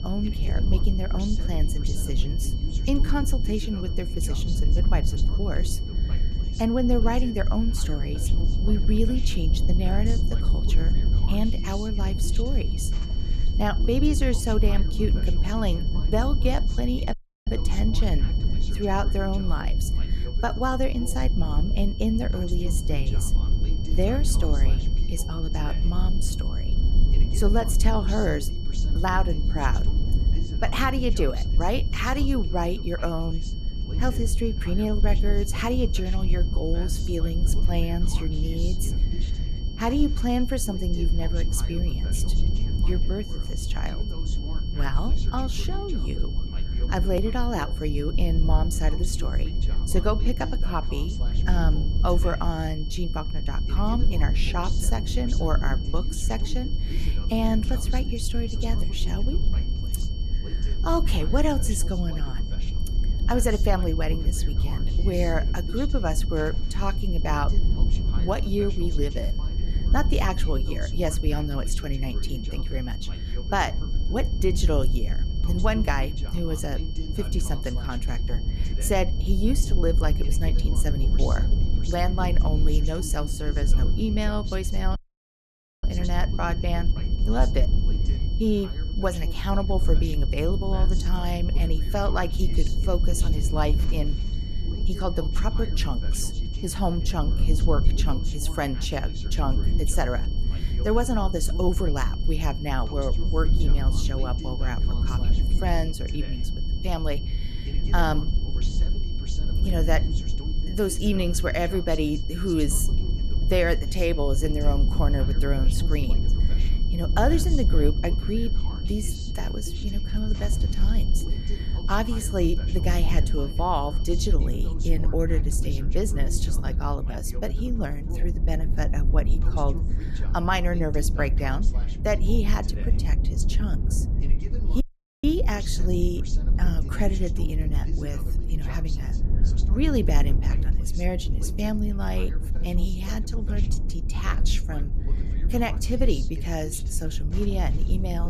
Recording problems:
high-pitched whine; noticeable; until 2:04; 3 kHz, 15 dB below the speech
voice in the background; noticeable; throughout; 15 dB below the speech
low rumble; noticeable; throughout; 10 dB below the speech
audio cutting out; at 17 s, at 1:25 for 1 s and at 2:15
abrupt cut into speech; at the end

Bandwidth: 14.5 kHz